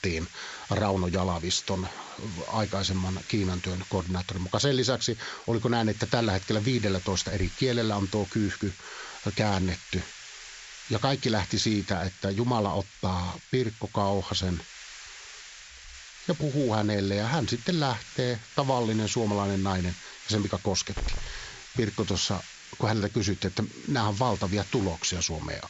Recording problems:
high frequencies cut off; noticeable; nothing above 7.5 kHz
hiss; noticeable; throughout; 15 dB below the speech

